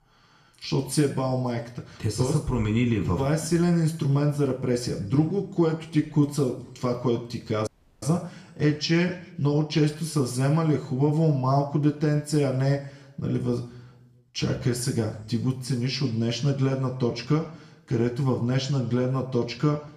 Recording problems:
room echo; slight; dies away in 0.6 s
off-mic speech; somewhat distant
audio cutting out; at 7.5 s

